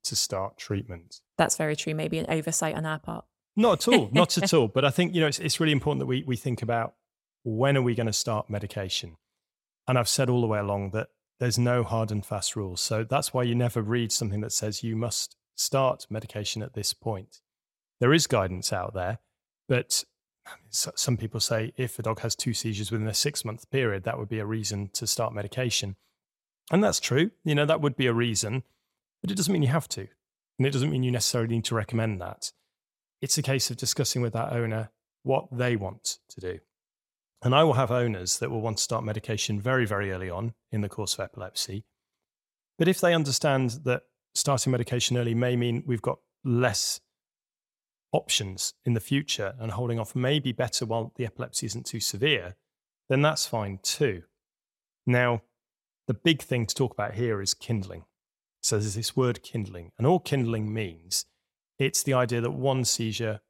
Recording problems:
none

